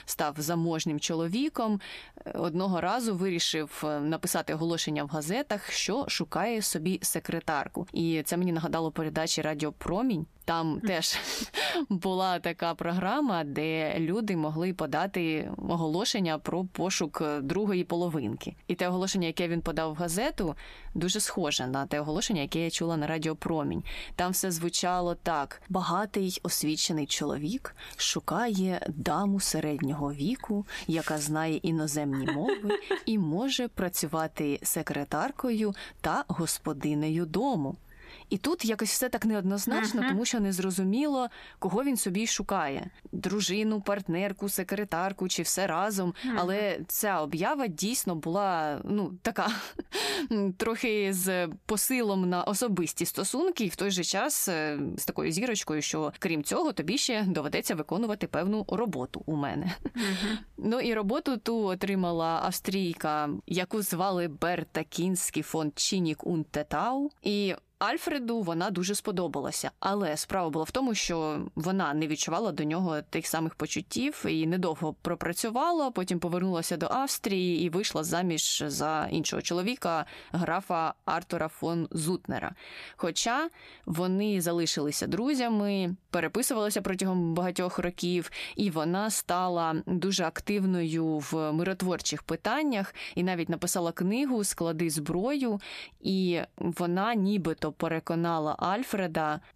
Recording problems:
squashed, flat; somewhat

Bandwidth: 14.5 kHz